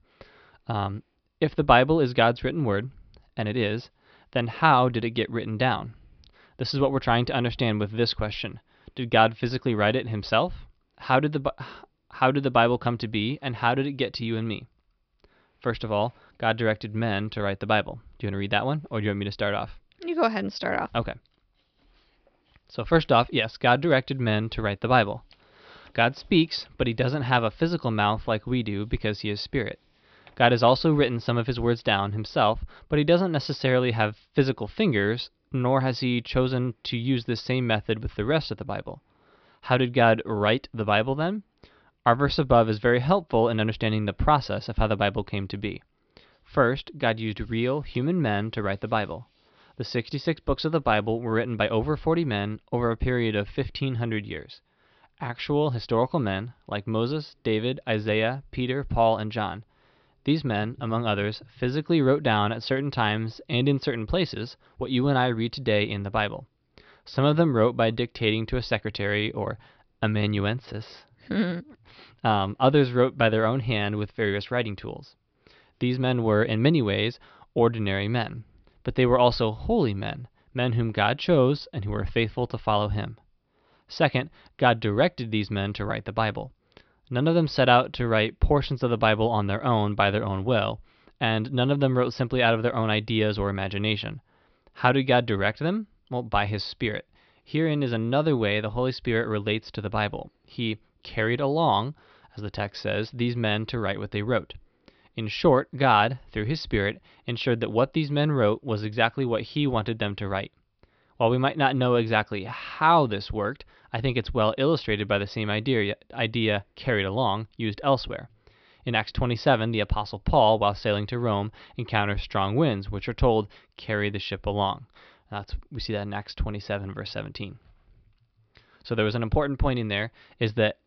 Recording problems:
high frequencies cut off; noticeable; nothing above 5.5 kHz

